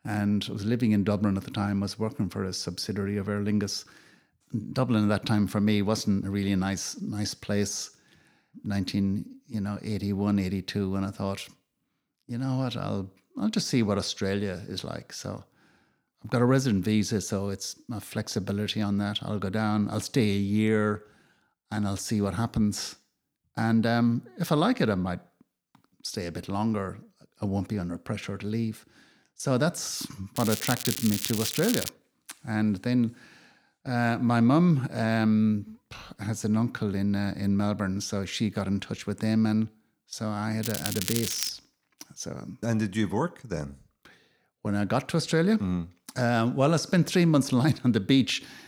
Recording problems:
crackling; loud; from 30 to 32 s and at 41 s; 4 dB below the speech

